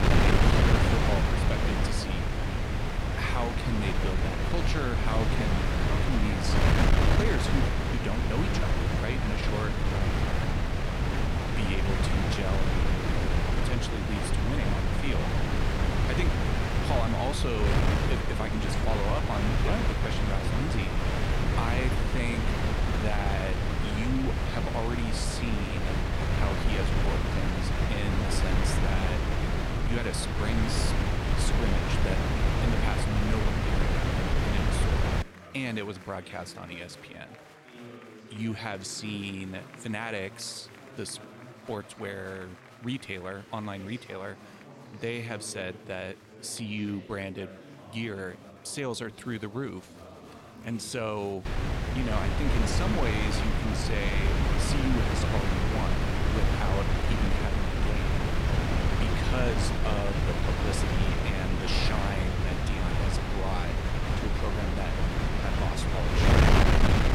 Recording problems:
wind noise on the microphone; heavy; until 35 s and from 51 s on; 4 dB above the speech
chatter from many people; noticeable; throughout; 10 dB below the speech

